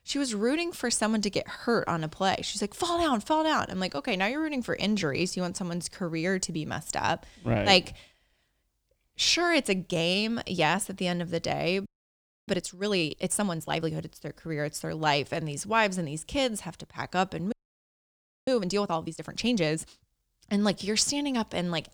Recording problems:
audio freezing; at 12 s for 0.5 s and at 18 s for 1 s

